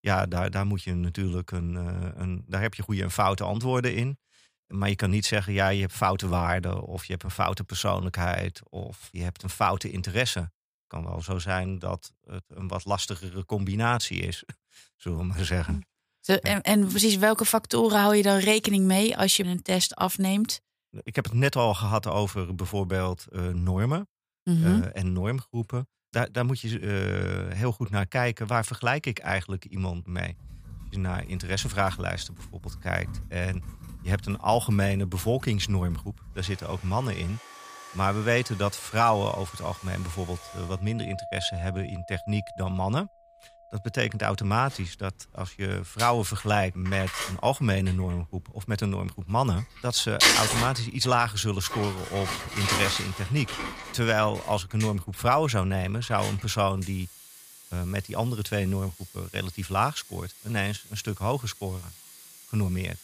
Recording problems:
household noises; loud; from 30 s on; 5 dB below the speech

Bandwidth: 15 kHz